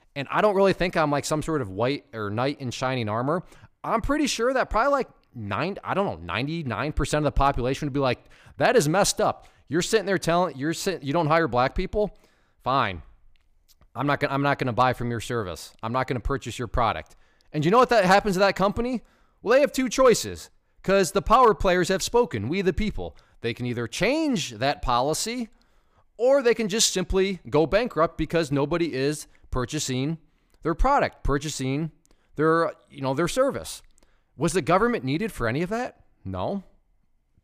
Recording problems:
none

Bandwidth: 15 kHz